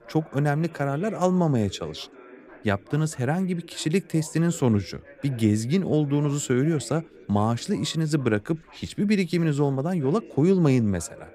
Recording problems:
background chatter; faint; throughout; 3 voices, 25 dB below the speech

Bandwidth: 15.5 kHz